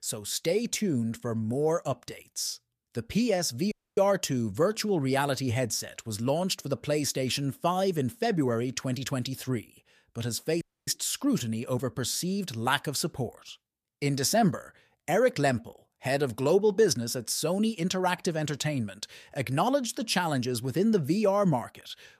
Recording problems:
audio cutting out; at 3.5 s and at 11 s

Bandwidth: 14.5 kHz